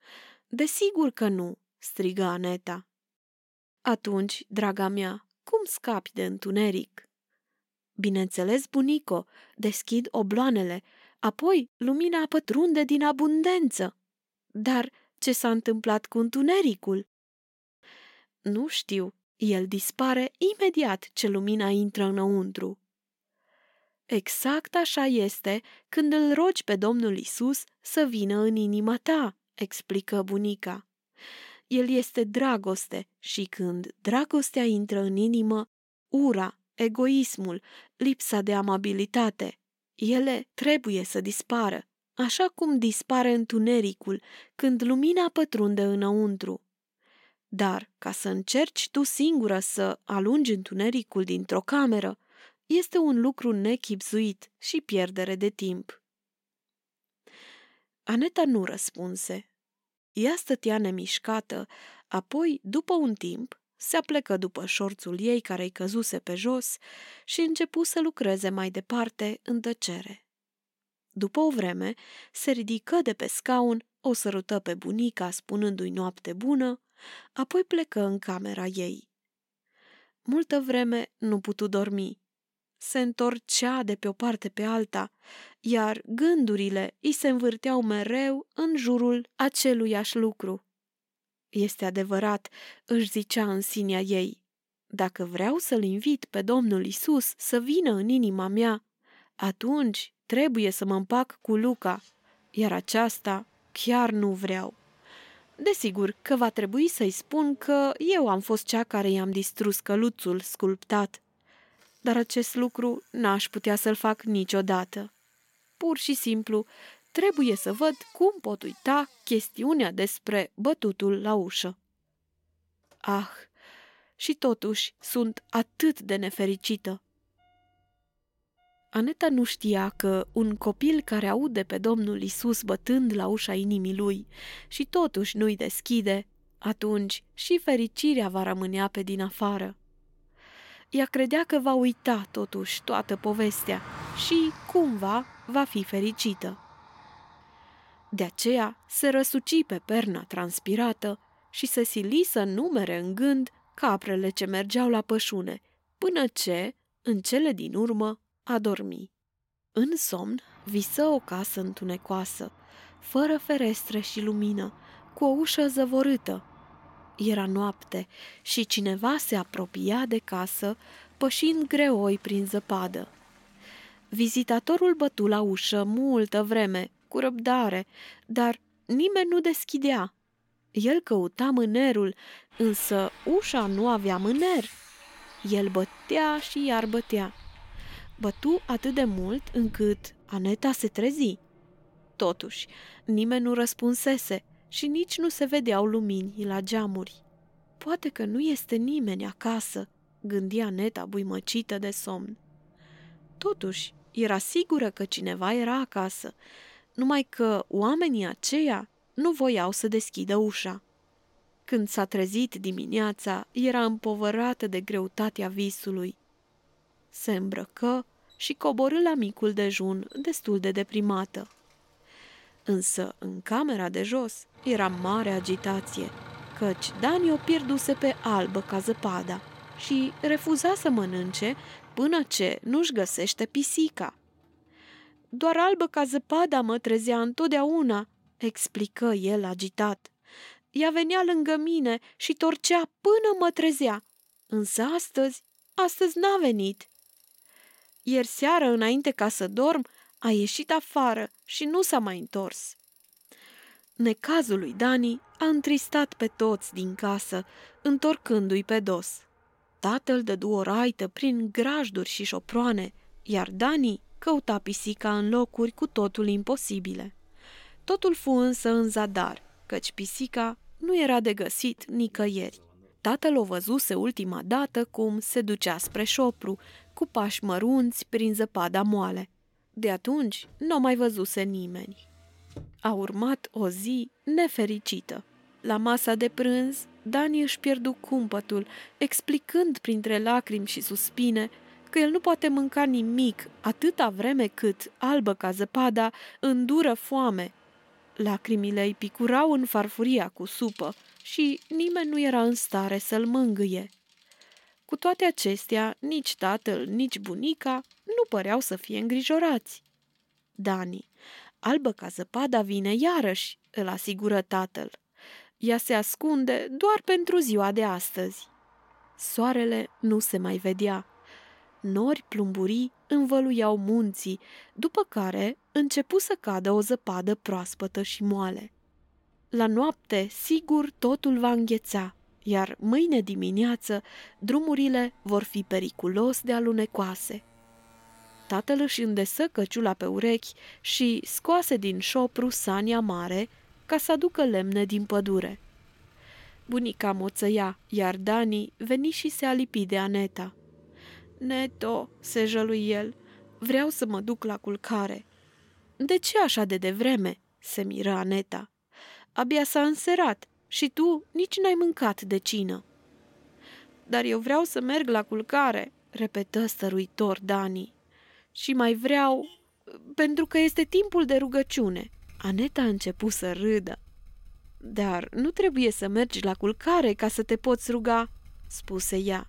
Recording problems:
traffic noise; faint; from 1:42 on; 25 dB below the speech

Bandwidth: 16.5 kHz